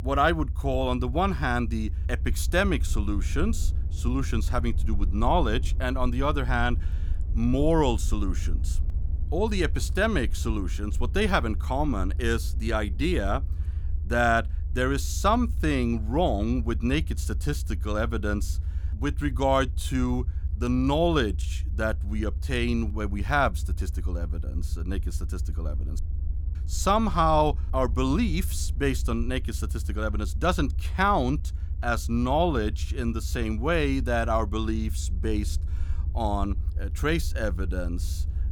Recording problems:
low rumble; faint; throughout; 20 dB below the speech

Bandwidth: 18.5 kHz